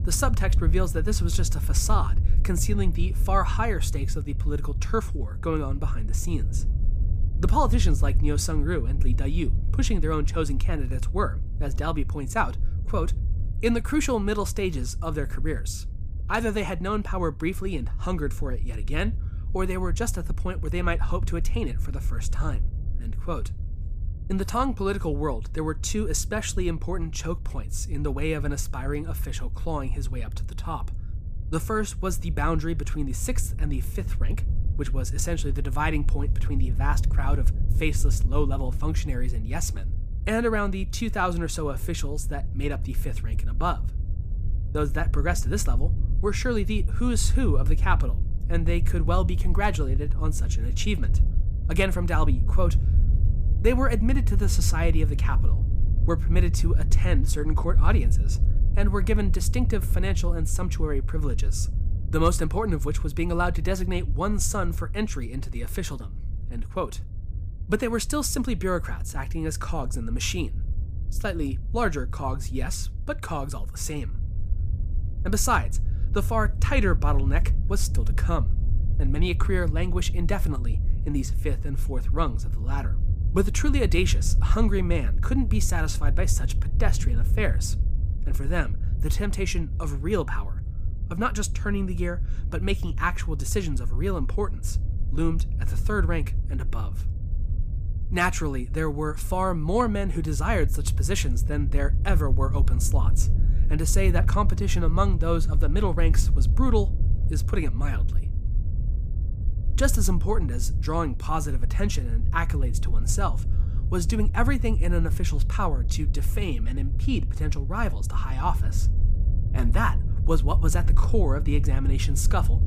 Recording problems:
low rumble; noticeable; throughout; 15 dB below the speech

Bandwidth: 15 kHz